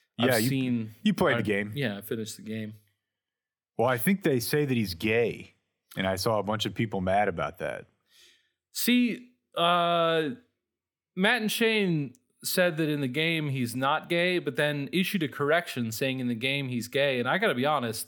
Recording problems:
none

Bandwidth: 19 kHz